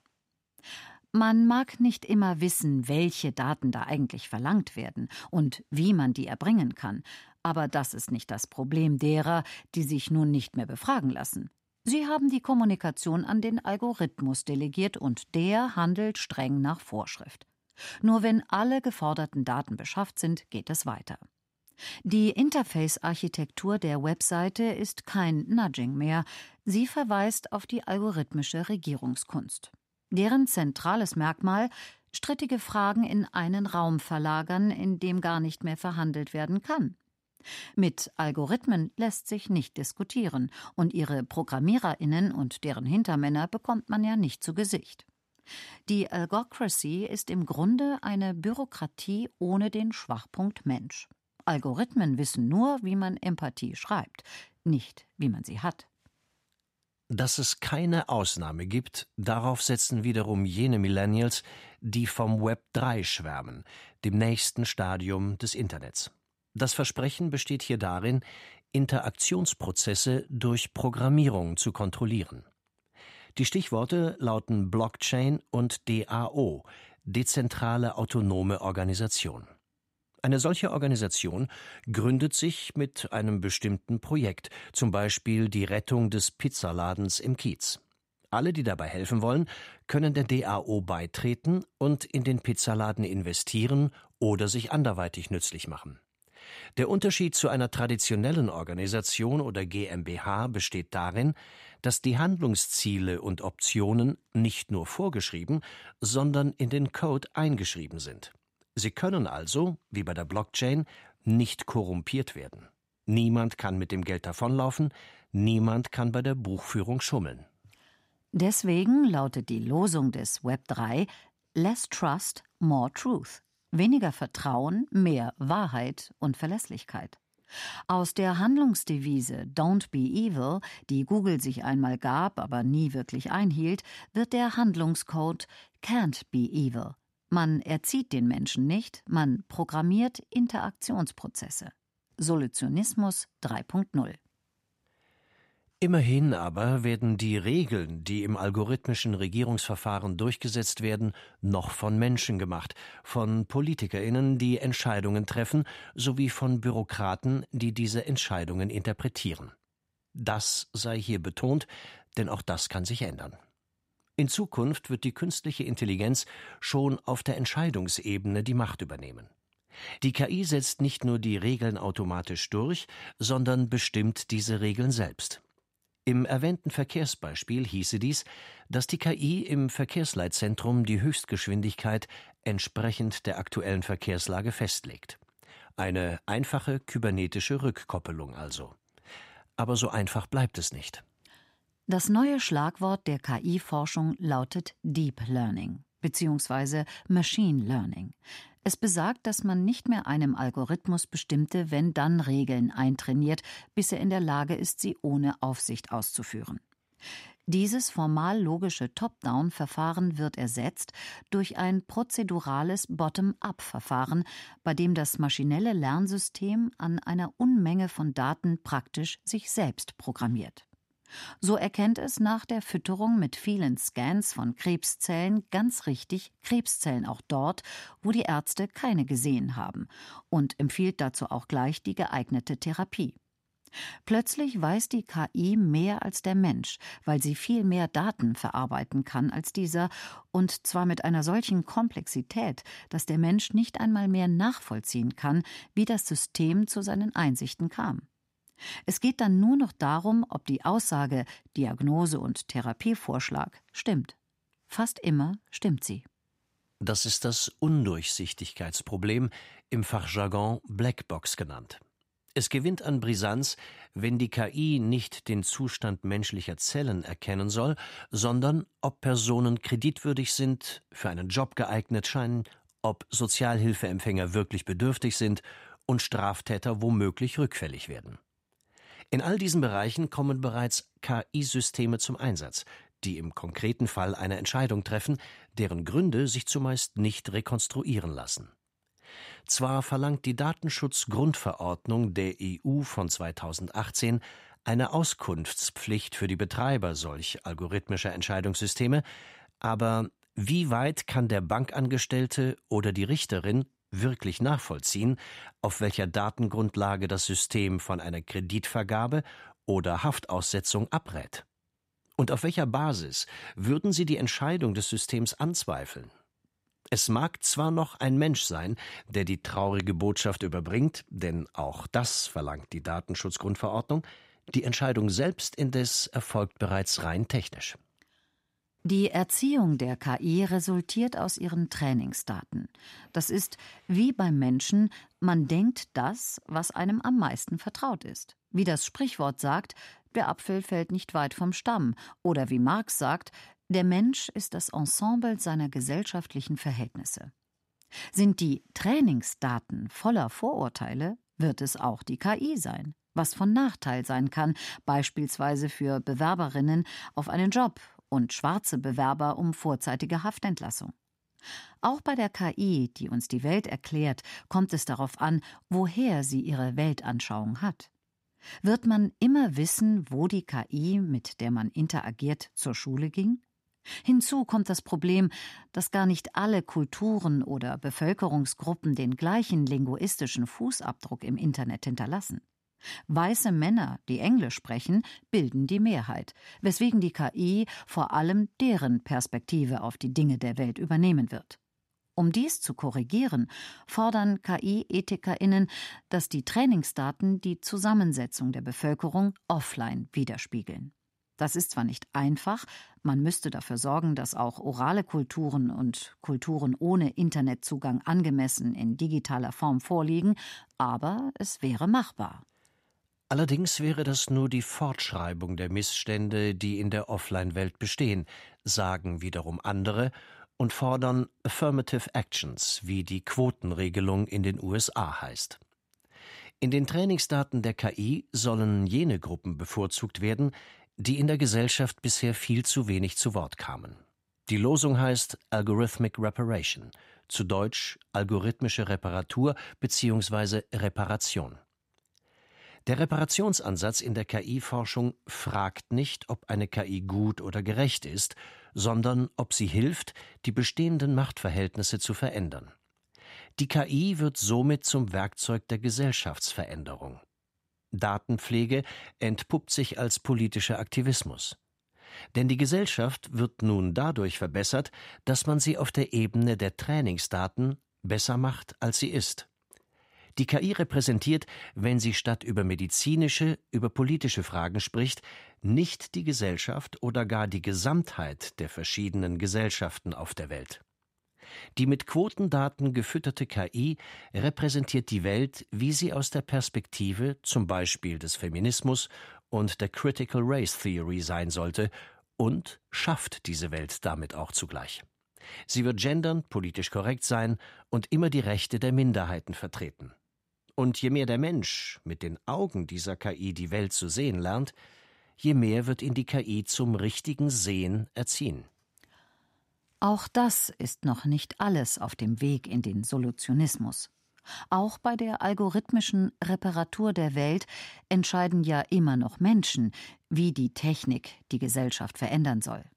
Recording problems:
none

